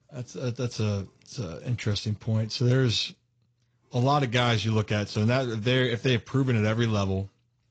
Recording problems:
garbled, watery; slightly

